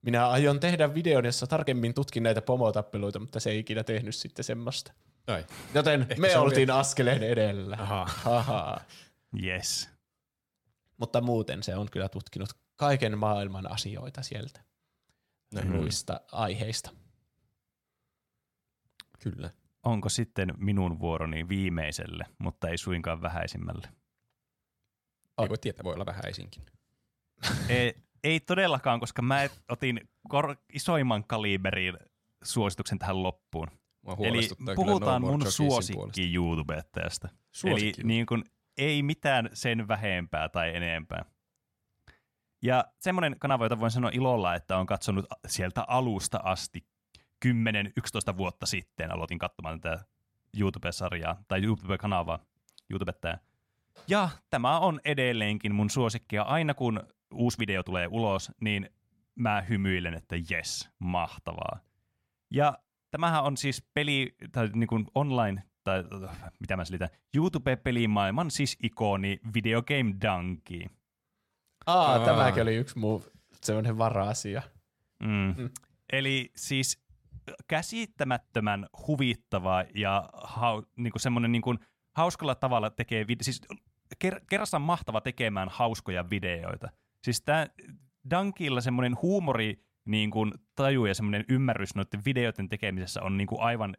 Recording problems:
uneven, jittery; strongly; from 1.5 s to 1:27

